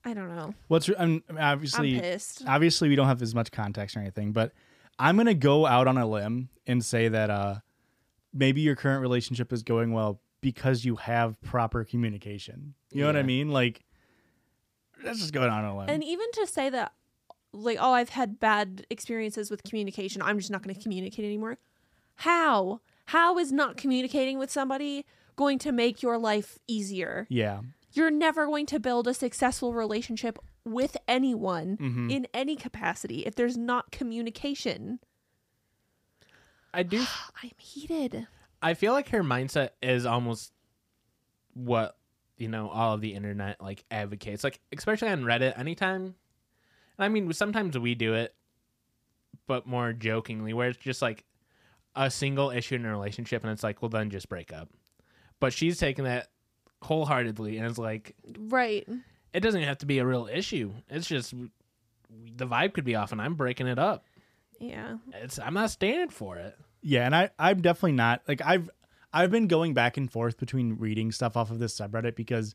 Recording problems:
none

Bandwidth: 15 kHz